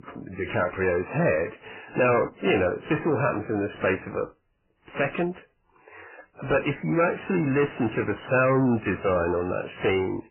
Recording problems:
distortion; heavy; 7 dB below the speech
garbled, watery; badly; nothing above 3 kHz

